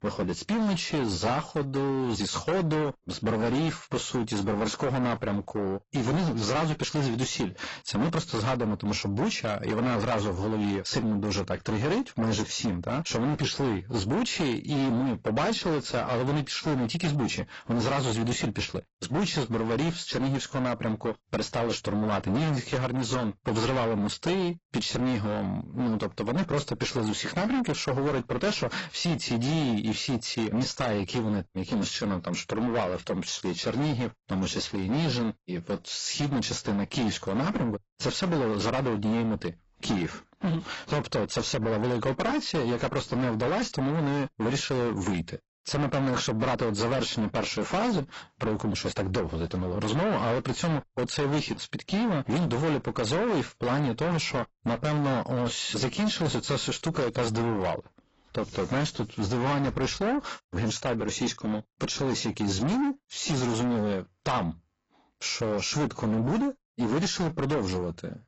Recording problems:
distortion; heavy; 6 dB below the speech
garbled, watery; badly; nothing above 8 kHz

